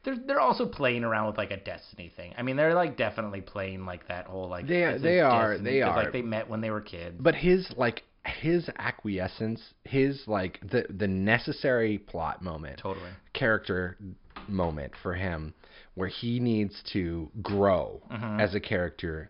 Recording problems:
high frequencies cut off; noticeable; nothing above 5.5 kHz

